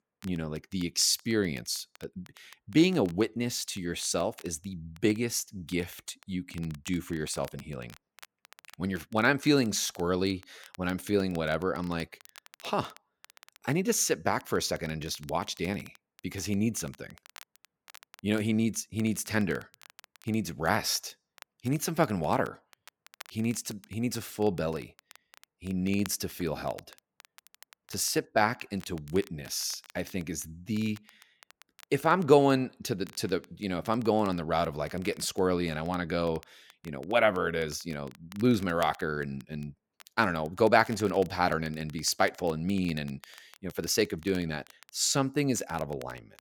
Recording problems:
crackle, like an old record; faint; 25 dB below the speech

